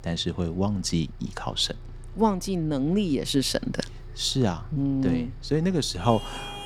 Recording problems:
traffic noise; noticeable; throughout; 15 dB below the speech

